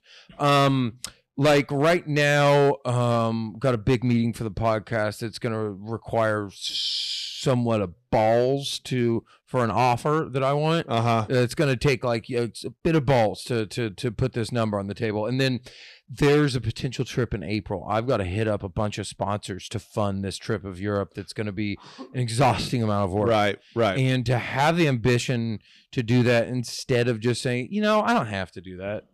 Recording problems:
distortion; slight; 4% of the sound clipped

